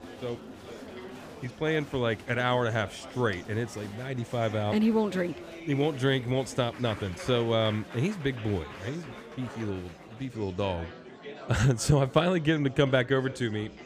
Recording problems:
murmuring crowd; noticeable; throughout; 15 dB below the speech

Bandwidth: 15 kHz